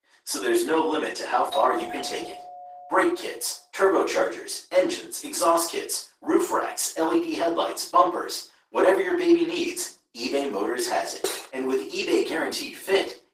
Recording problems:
off-mic speech; far
thin; very; fading below 350 Hz
room echo; slight; dies away in 0.4 s
garbled, watery; slightly; nothing above 15.5 kHz
doorbell; noticeable; from 1.5 to 3 s; peak 6 dB below the speech
clattering dishes; noticeable; at 11 s; peak 4 dB below the speech

